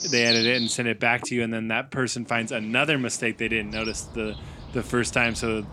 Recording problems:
animal sounds; loud; throughout; 5 dB below the speech

